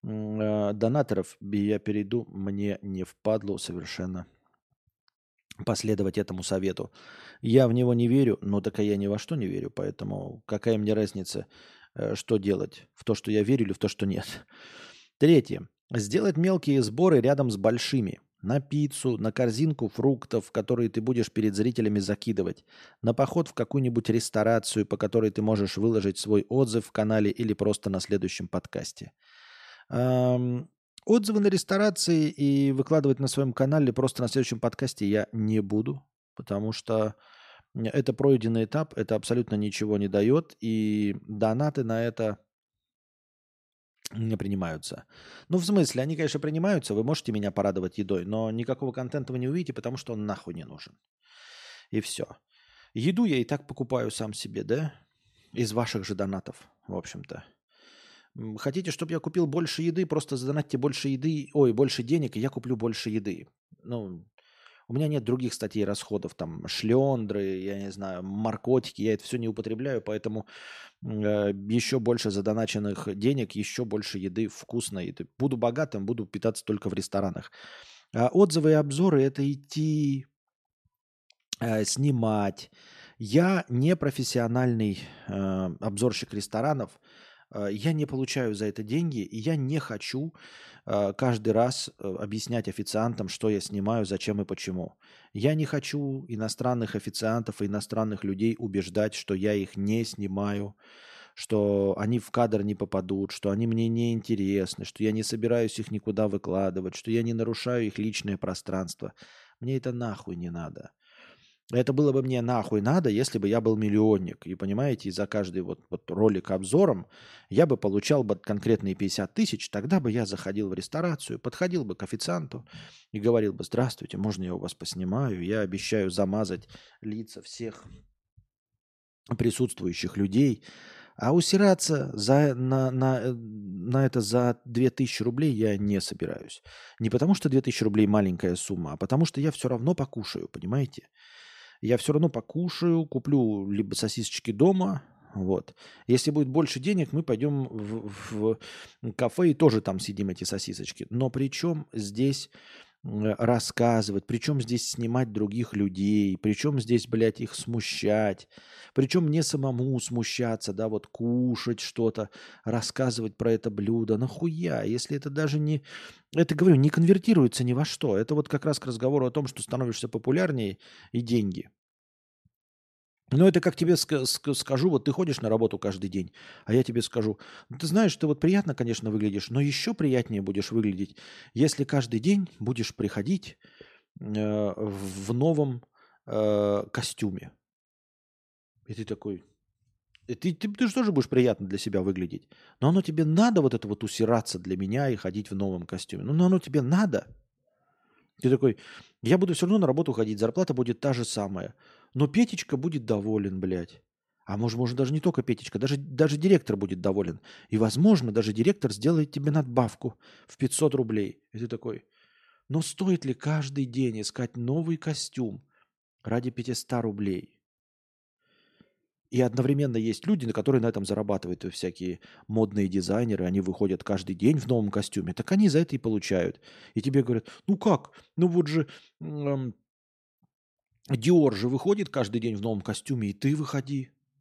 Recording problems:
none

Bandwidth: 14 kHz